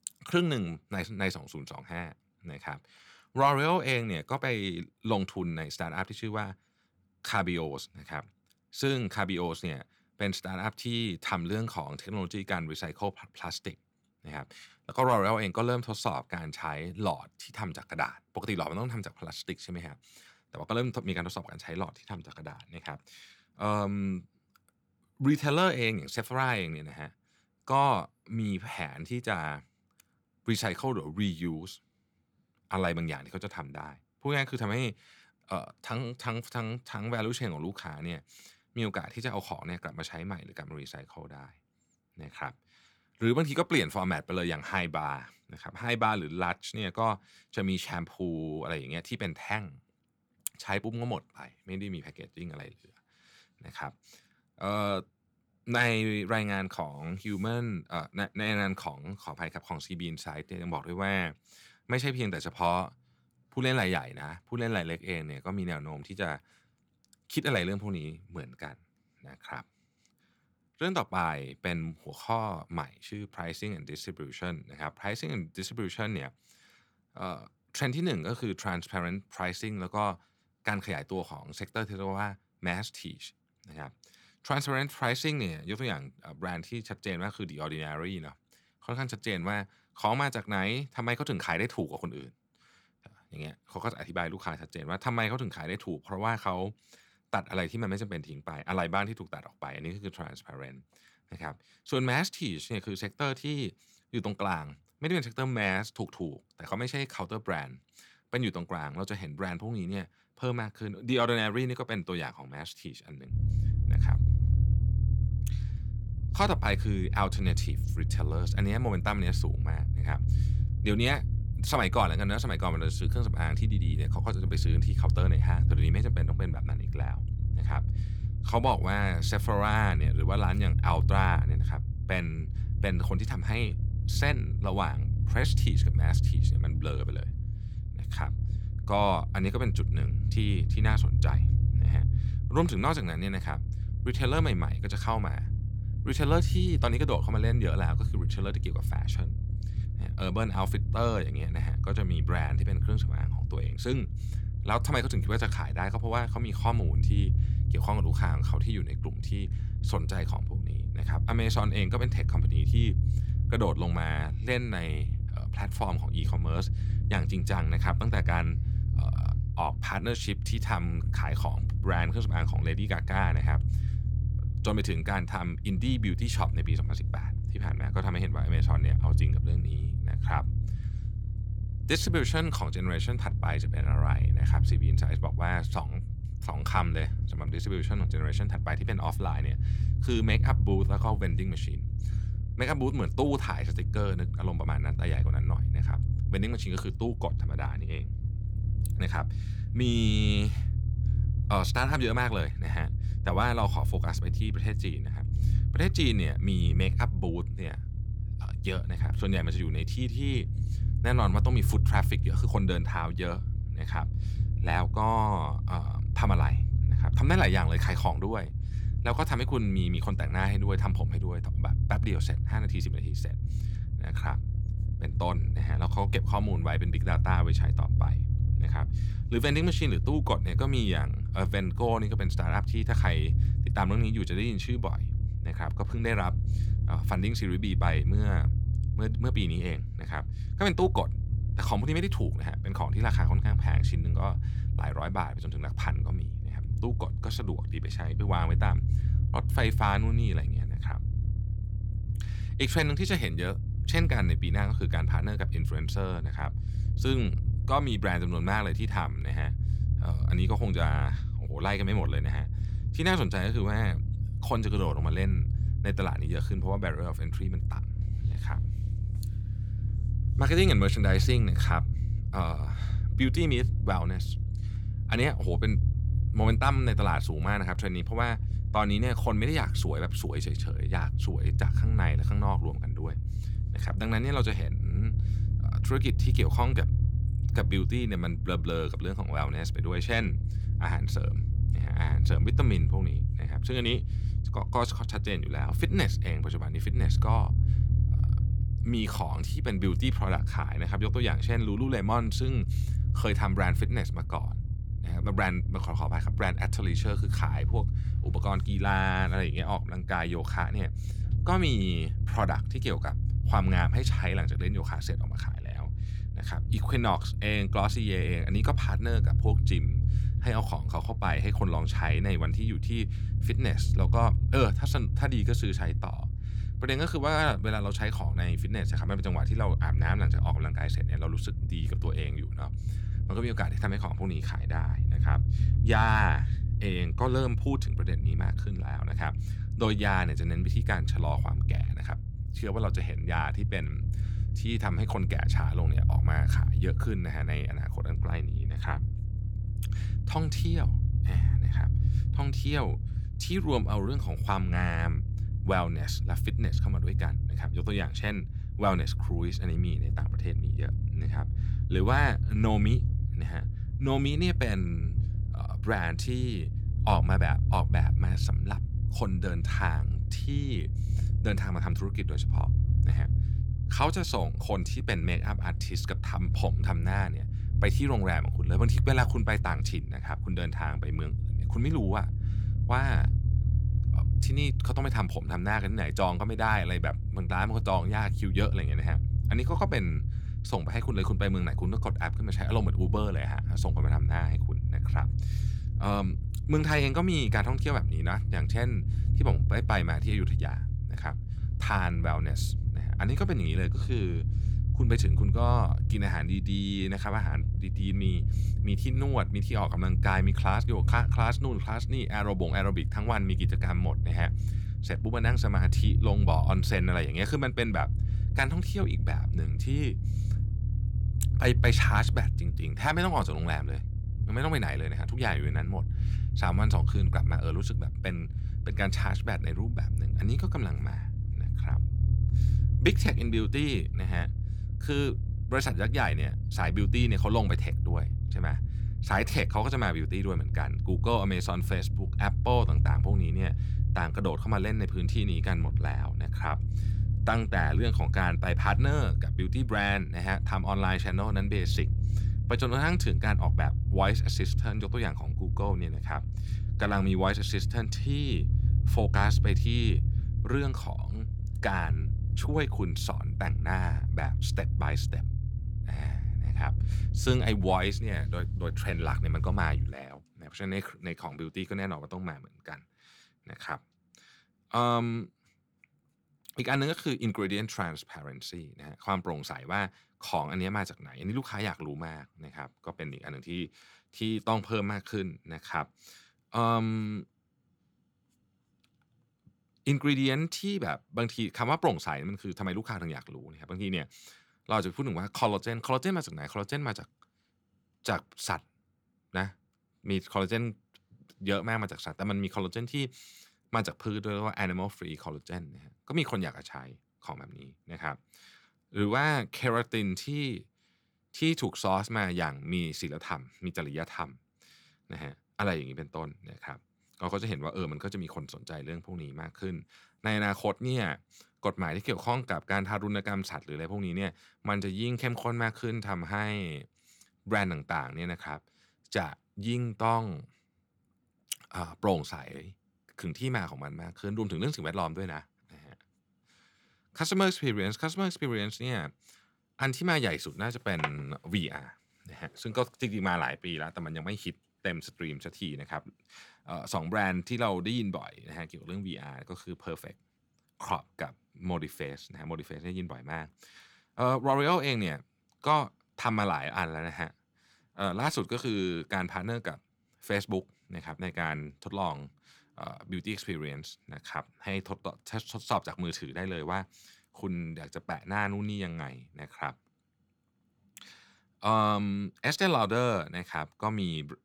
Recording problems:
low rumble; noticeable; from 1:53 to 7:50; 10 dB below the speech

